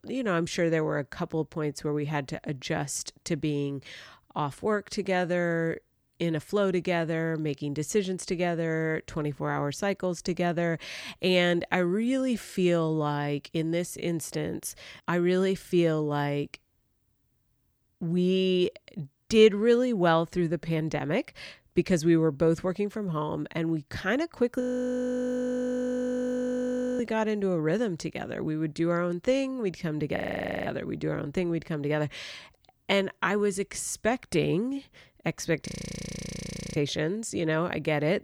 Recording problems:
audio freezing; at 25 s for 2.5 s, at 30 s and at 36 s for 1 s

